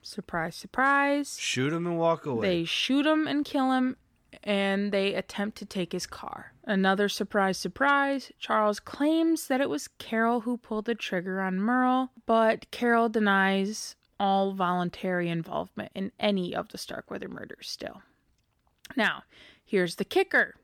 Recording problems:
none

